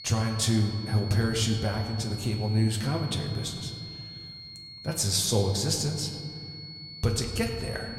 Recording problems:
room echo; slight; dies away in 2 s
off-mic speech; somewhat distant
high-pitched whine; noticeable; throughout; 4.5 kHz, 15 dB below the speech

